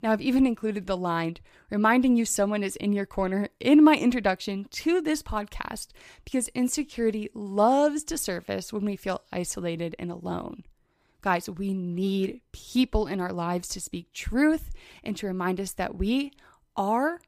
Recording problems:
none

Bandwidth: 15 kHz